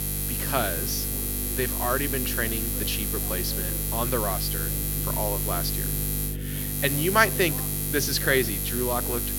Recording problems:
electrical hum; loud; throughout; 50 Hz, 6 dB below the speech
voice in the background; noticeable; throughout; 15 dB below the speech

